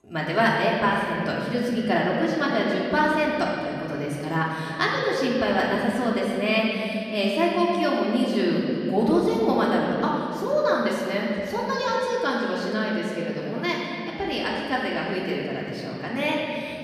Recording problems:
off-mic speech; far
room echo; noticeable; dies away in 2.9 s

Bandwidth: 14.5 kHz